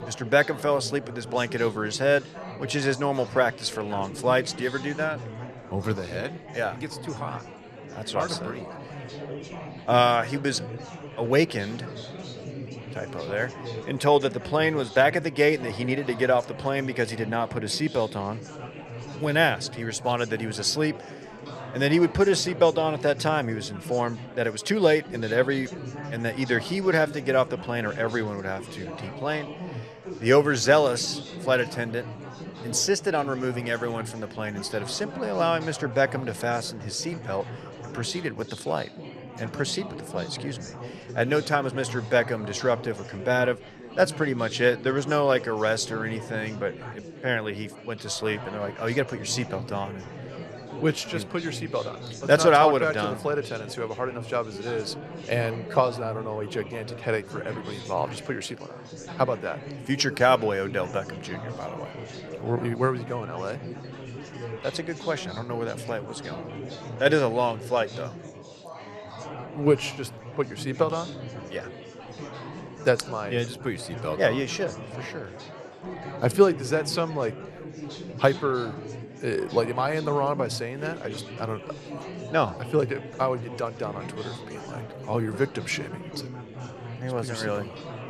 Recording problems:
chatter from many people; noticeable; throughout; 15 dB below the speech

